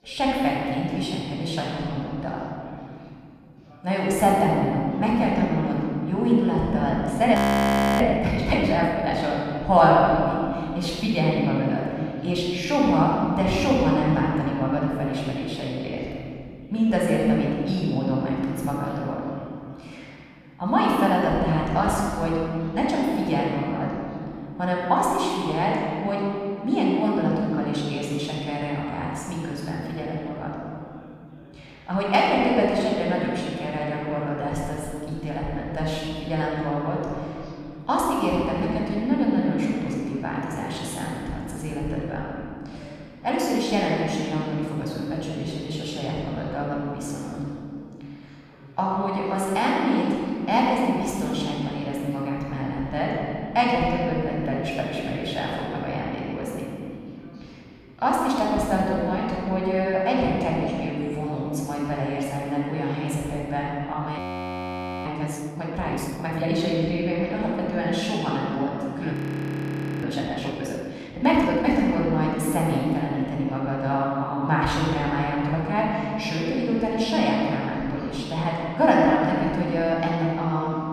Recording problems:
room echo; strong; dies away in 2.6 s
off-mic speech; far
background chatter; faint; throughout; 4 voices, 25 dB below the speech
audio freezing; at 7.5 s for 0.5 s, at 1:04 for 1 s and at 1:09 for 1 s

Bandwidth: 15 kHz